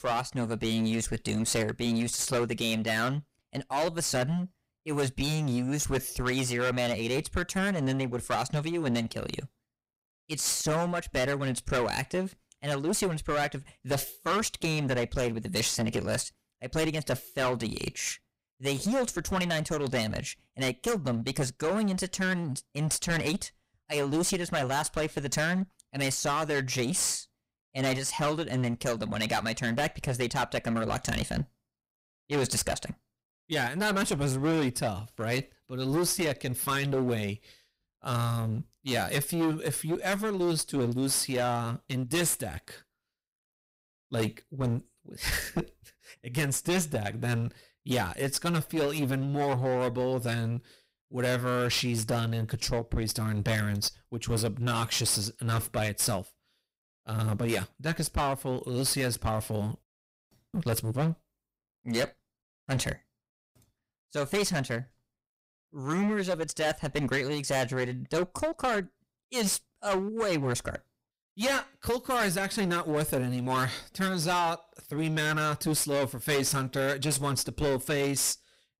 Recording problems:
distortion; heavy; 14% of the sound clipped

